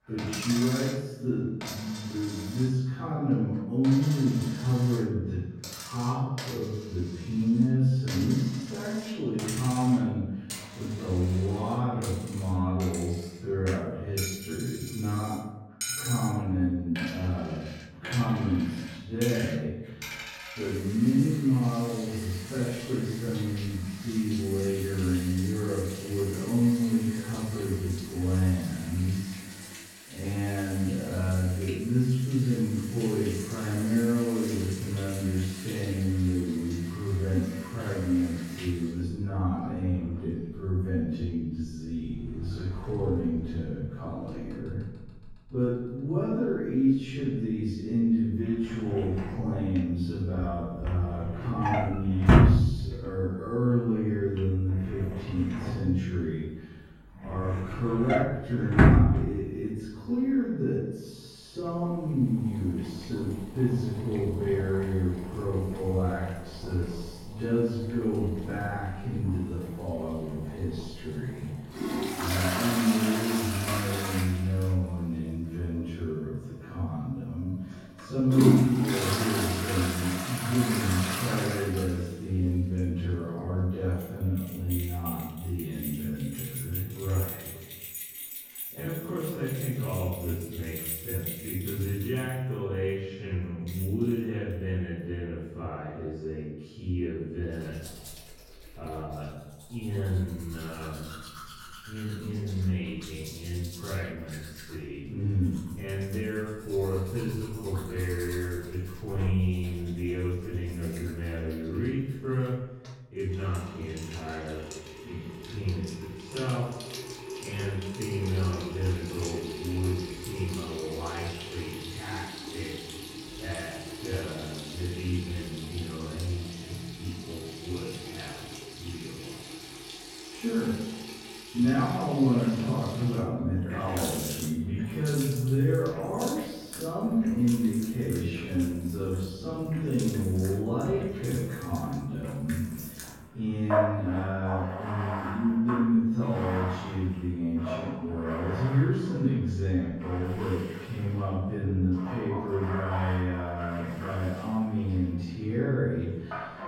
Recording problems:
room echo; strong; dies away in 1.3 s
off-mic speech; far
wrong speed, natural pitch; too slow; 0.5 times normal speed
household noises; loud; throughout; 5 dB below the speech

